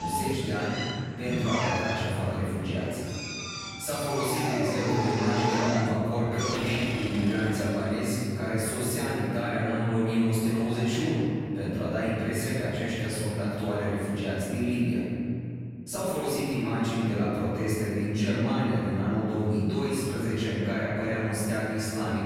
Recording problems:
room echo; strong; dies away in 2.9 s
off-mic speech; far
machinery noise; very faint; until 8 s; 5 dB below the speech
abrupt cut into speech; at the start

